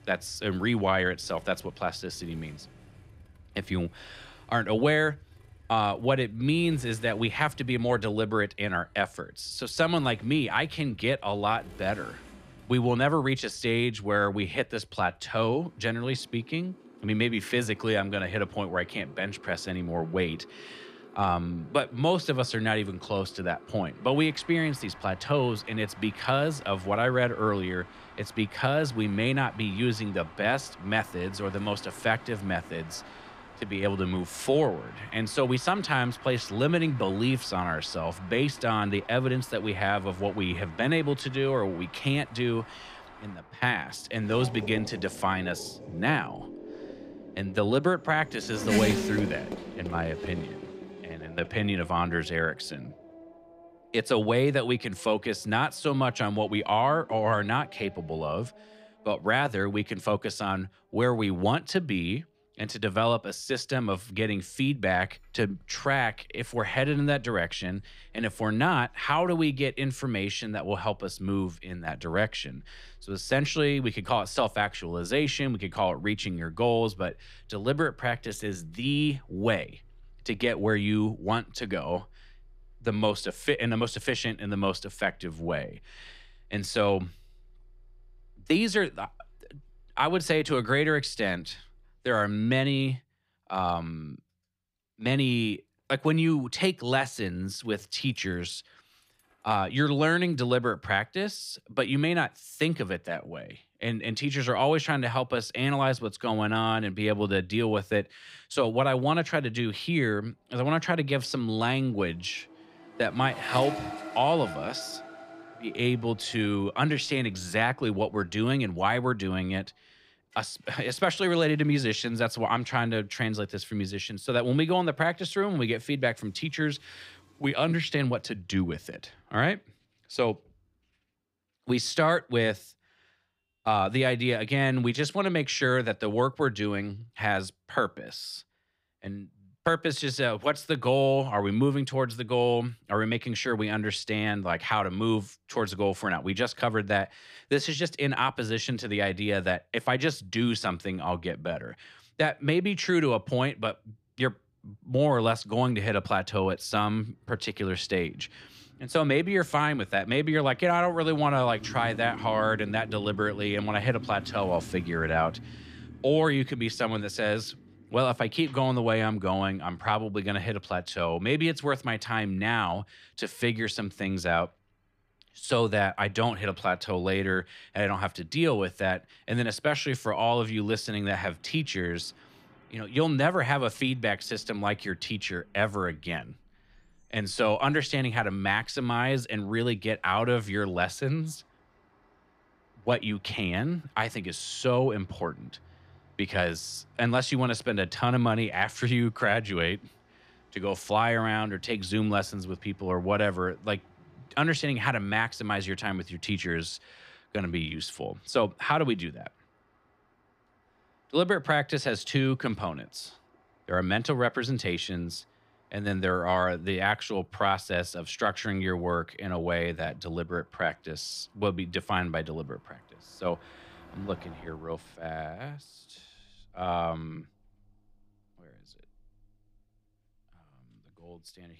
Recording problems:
traffic noise; noticeable; throughout; 15 dB below the speech

